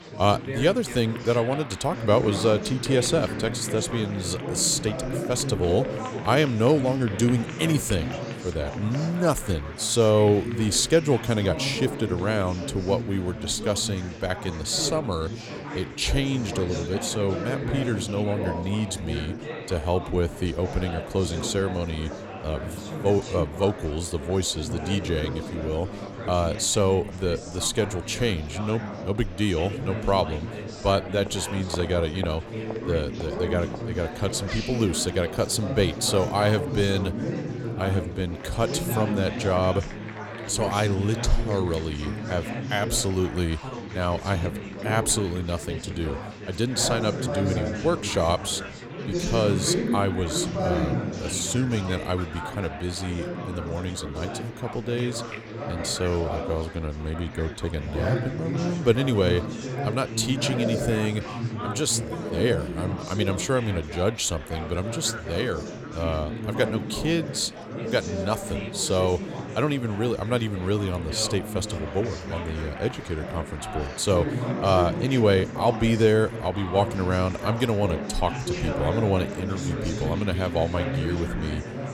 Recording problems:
chatter from many people; loud; throughout; 6 dB below the speech

